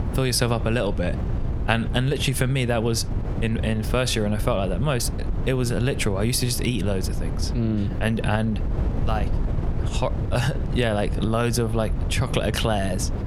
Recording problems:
squashed, flat; somewhat
wind noise on the microphone; occasional gusts; 15 dB below the speech

